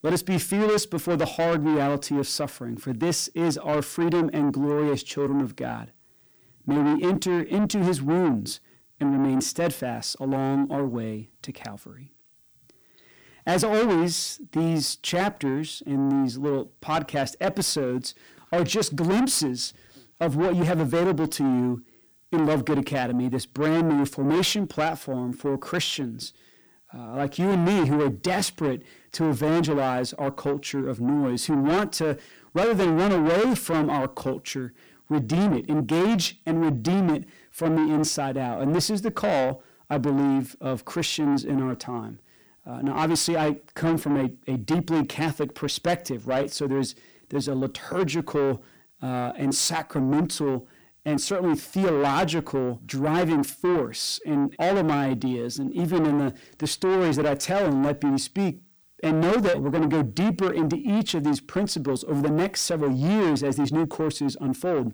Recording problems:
distortion; heavy; 6 dB below the speech

